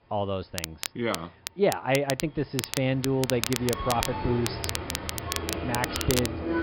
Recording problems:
high frequencies cut off; noticeable; nothing above 5.5 kHz
train or aircraft noise; loud; throughout; 6 dB below the speech
crackle, like an old record; loud; 5 dB below the speech

